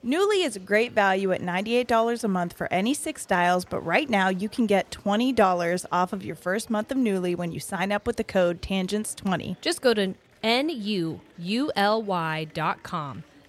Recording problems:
murmuring crowd; faint; throughout; 30 dB below the speech

